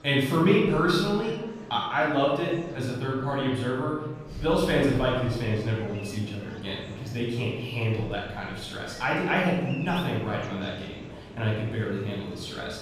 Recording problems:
off-mic speech; far
room echo; noticeable; dies away in 1.1 s
murmuring crowd; noticeable; throughout; 20 dB below the speech
animal sounds; very faint; throughout; 20 dB below the speech

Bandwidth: 15 kHz